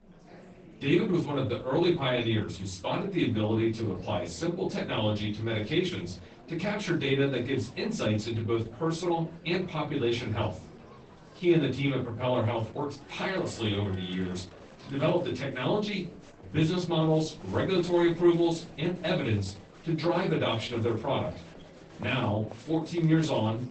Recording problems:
off-mic speech; far
garbled, watery; badly; nothing above 8 kHz
room echo; slight; dies away in 0.3 s
chatter from many people; faint; throughout; 20 dB below the speech

